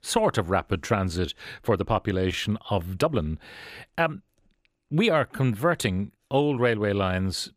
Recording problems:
uneven, jittery; strongly; from 0.5 to 6.5 s

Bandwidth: 15 kHz